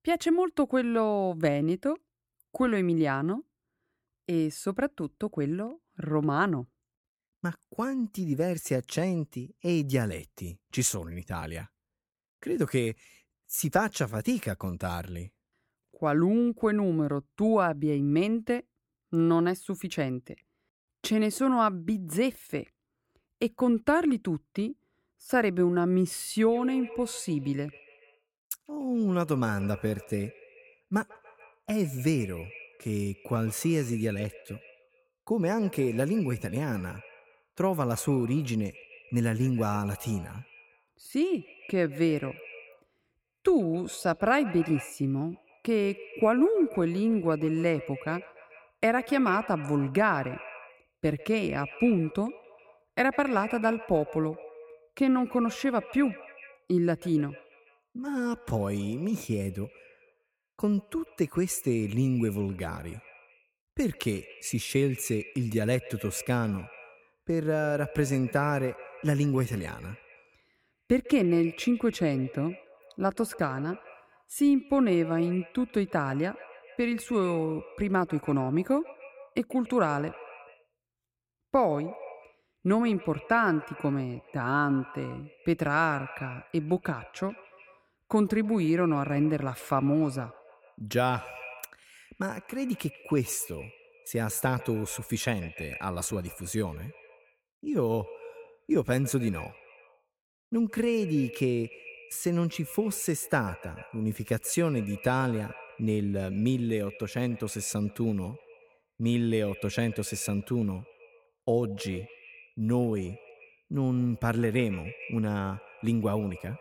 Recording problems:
echo of what is said; noticeable; from 27 s on; 140 ms later, 20 dB below the speech

